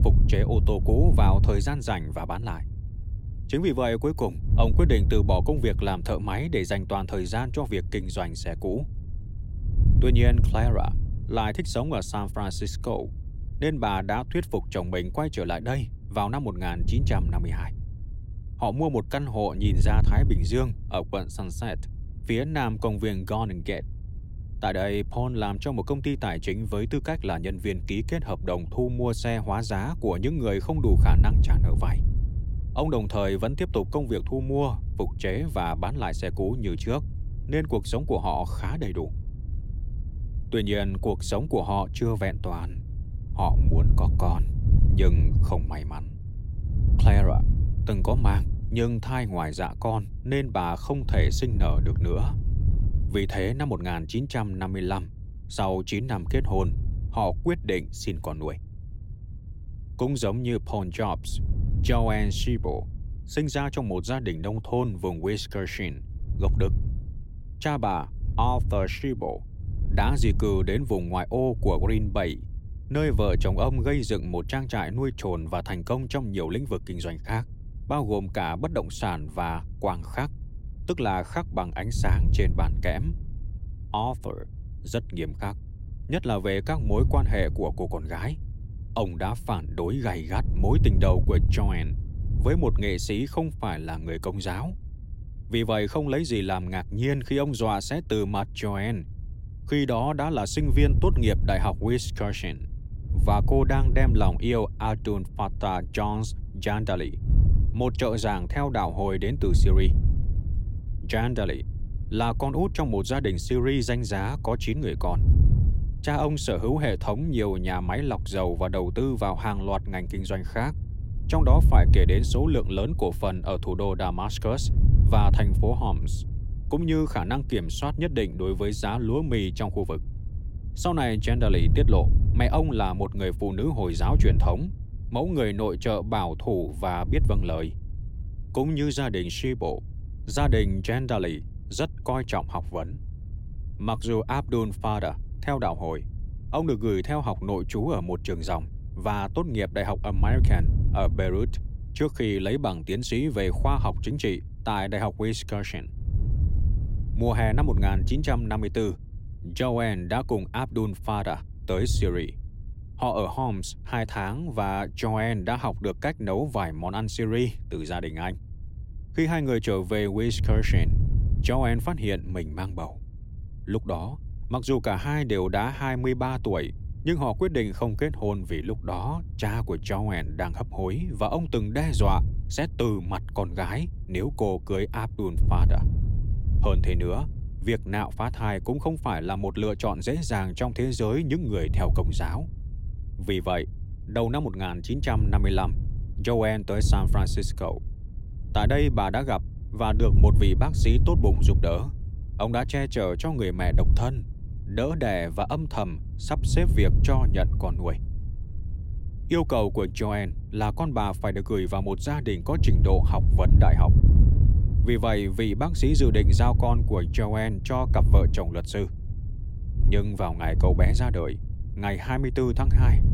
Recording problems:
wind noise on the microphone; occasional gusts; 15 dB below the speech

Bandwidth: 16 kHz